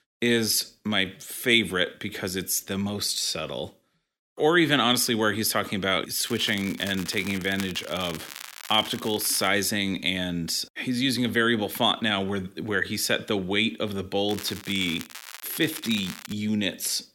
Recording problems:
crackling; noticeable; from 6.5 to 9.5 s and from 14 to 16 s; 15 dB below the speech

